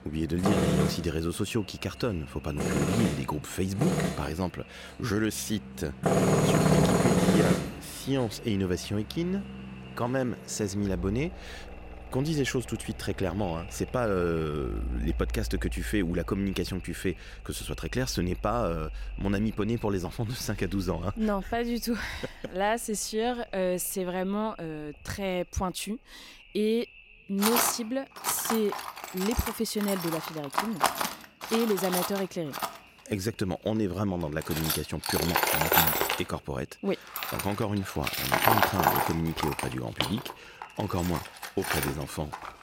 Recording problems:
echo of what is said; faint; throughout; 490 ms later, 25 dB below the speech
machinery noise; very loud; throughout; 2 dB above the speech

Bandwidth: 16 kHz